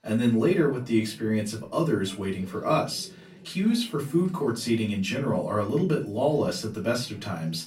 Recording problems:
off-mic speech; far
room echo; very slight; dies away in 0.2 s
voice in the background; faint; throughout; 25 dB below the speech

